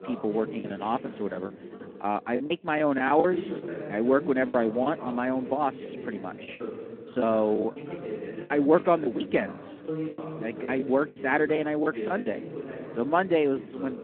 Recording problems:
muffled; very; fading above 2.5 kHz
phone-call audio
voice in the background; noticeable; throughout; 10 dB below the speech
choppy; very; from 0.5 to 5 s, from 6 to 7.5 s and from 8.5 to 12 s; 13% of the speech affected

